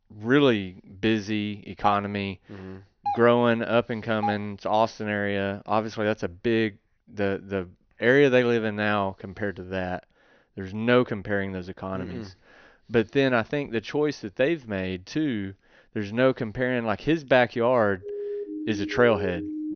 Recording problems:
high frequencies cut off; noticeable; nothing above 6 kHz
doorbell; noticeable; from 2 to 4.5 s; peak 6 dB below the speech
siren; noticeable; from 18 s on; peak 7 dB below the speech

